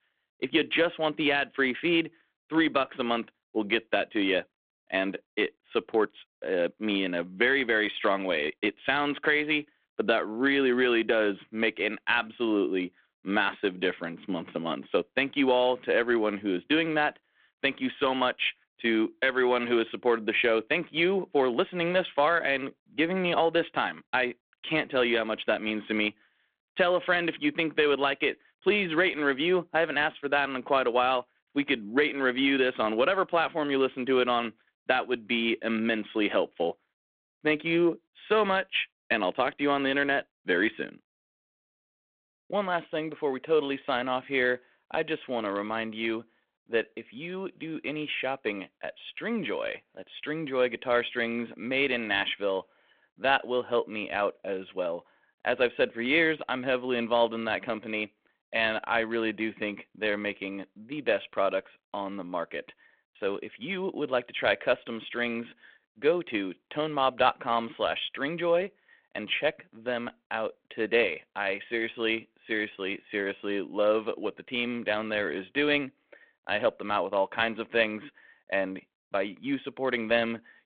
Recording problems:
phone-call audio

